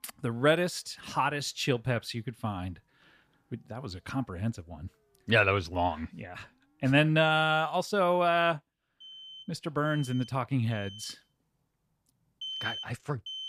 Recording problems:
alarms or sirens; noticeable; throughout; 15 dB below the speech

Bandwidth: 14.5 kHz